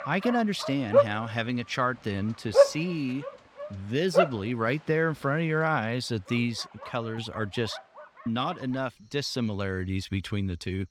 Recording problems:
animal sounds; very loud; throughout; 4 dB above the speech

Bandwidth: 18.5 kHz